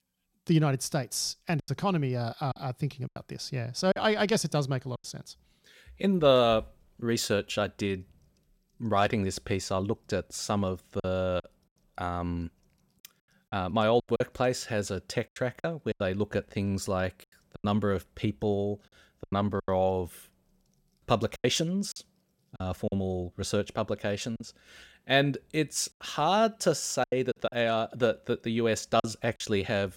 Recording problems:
choppy; very; 7% of the speech affected

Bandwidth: 16 kHz